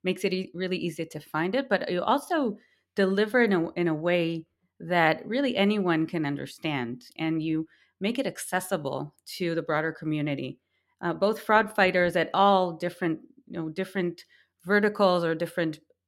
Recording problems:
none

